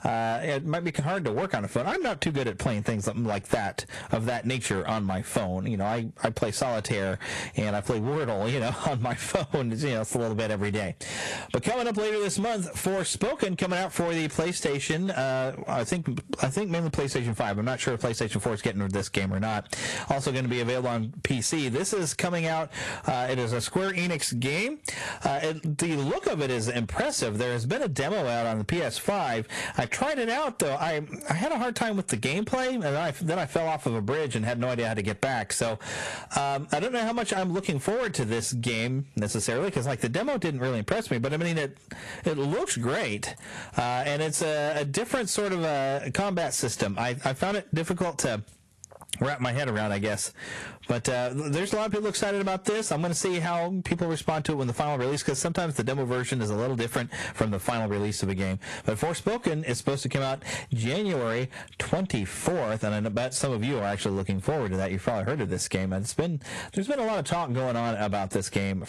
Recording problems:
distortion; slight; 13% of the sound clipped
garbled, watery; slightly; nothing above 11 kHz
squashed, flat; somewhat

